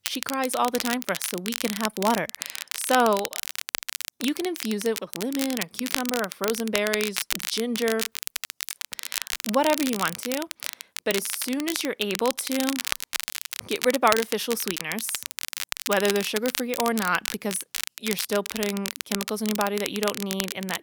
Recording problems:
crackle, like an old record; loud; 4 dB below the speech

